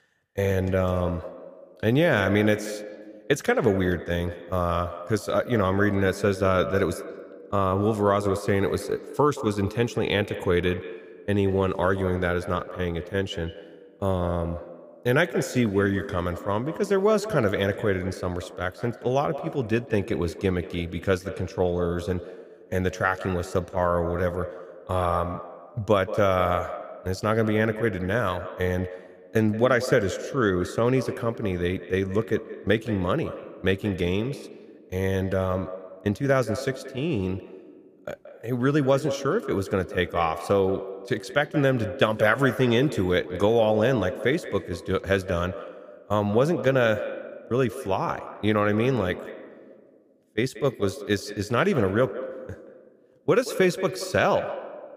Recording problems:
echo of what is said; strong; throughout; 180 ms later, 10 dB below the speech

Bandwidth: 15 kHz